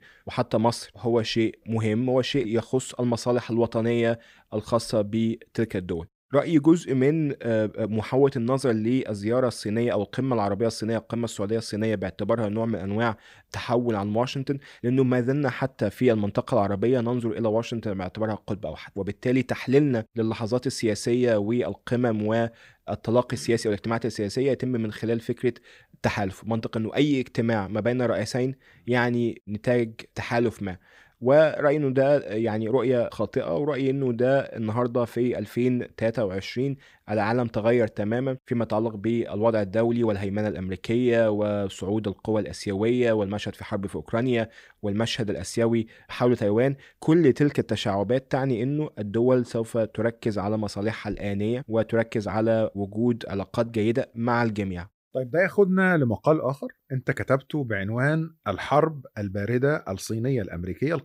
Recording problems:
none

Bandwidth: 15.5 kHz